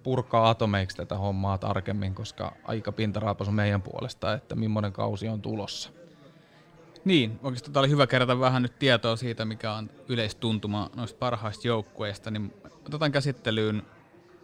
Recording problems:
chatter from many people; faint; throughout; 25 dB below the speech

